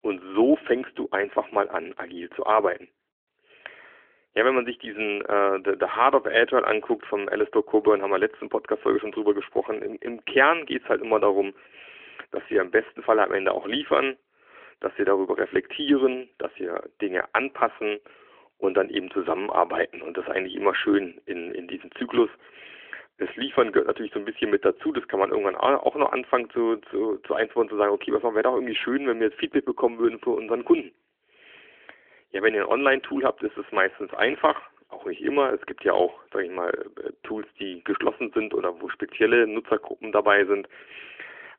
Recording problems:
phone-call audio; nothing above 3.5 kHz

